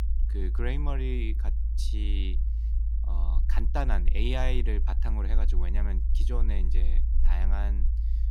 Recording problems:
low rumble; noticeable; throughout; 10 dB below the speech

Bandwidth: 17.5 kHz